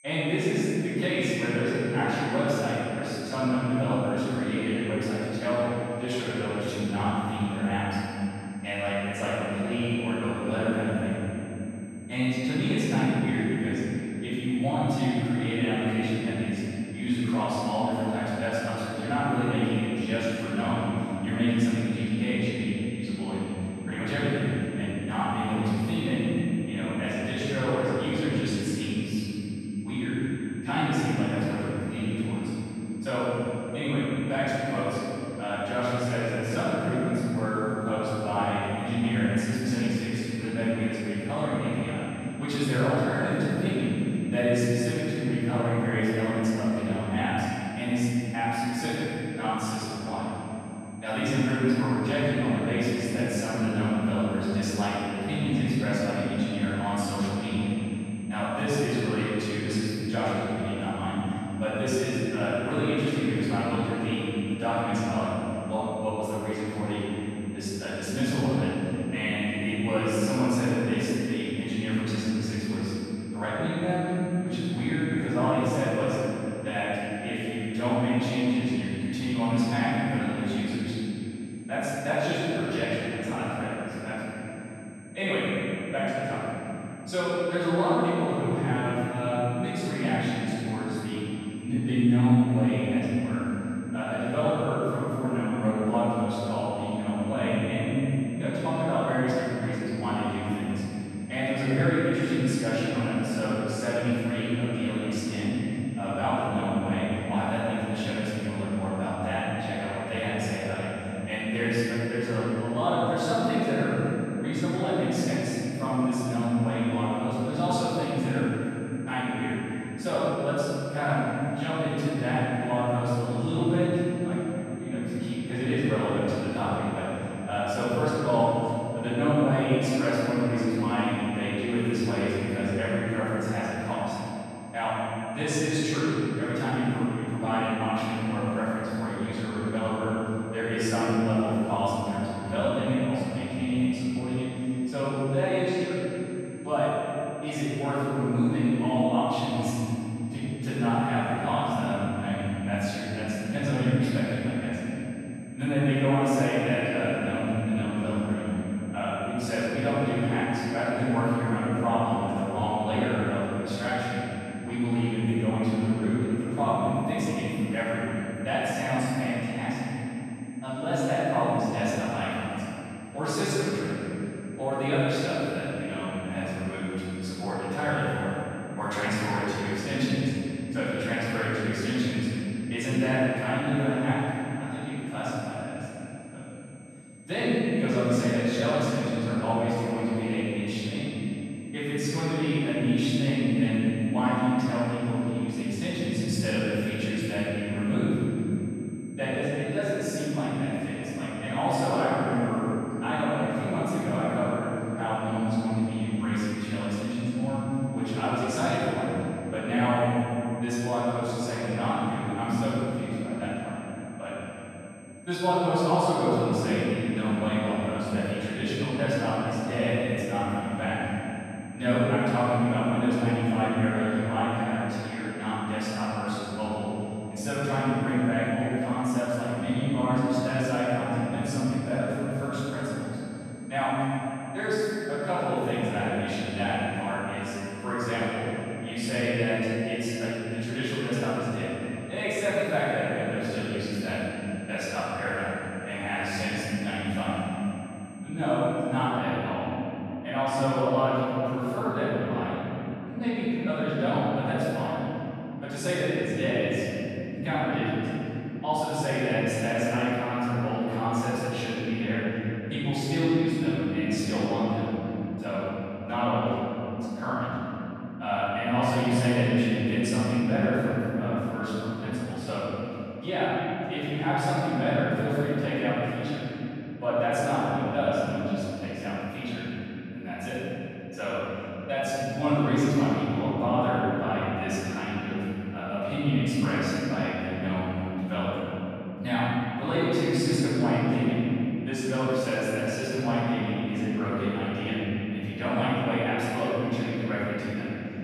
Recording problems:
room echo; strong; dies away in 3 s
off-mic speech; far
high-pitched whine; faint; until 4:09; 8.5 kHz, 25 dB below the speech

